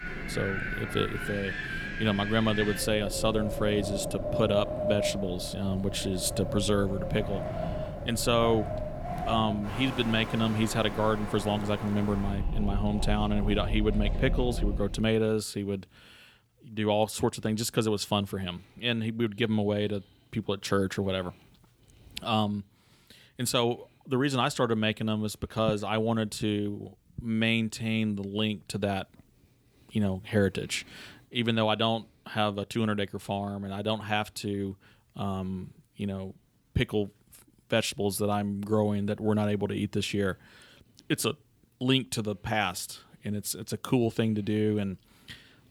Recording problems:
wind in the background; loud; until 15 s; 5 dB below the speech

